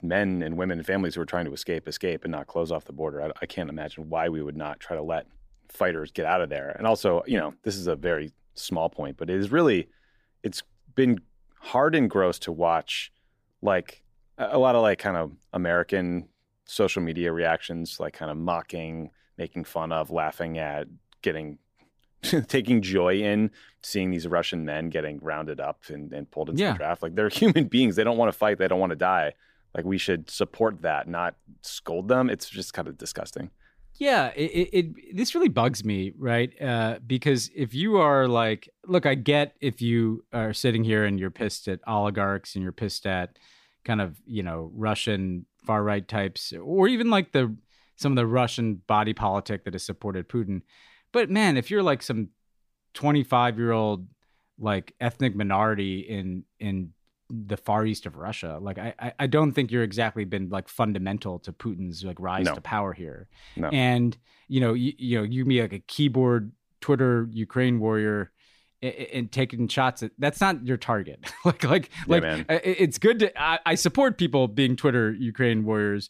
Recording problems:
none

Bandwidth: 15 kHz